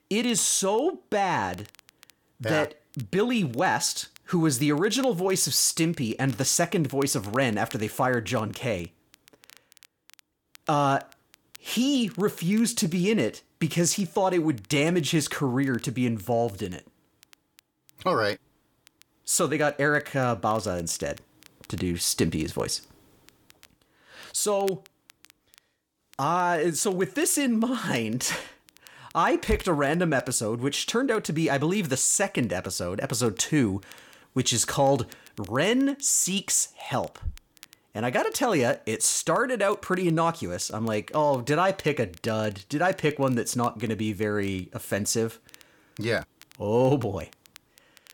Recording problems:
crackle, like an old record; faint; 30 dB below the speech

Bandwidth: 18 kHz